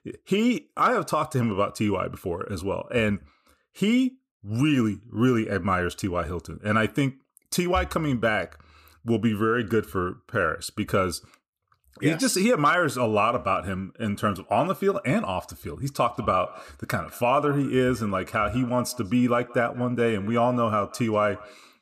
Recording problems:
echo of what is said; faint; from 16 s on; 190 ms later, 20 dB below the speech

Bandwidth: 14.5 kHz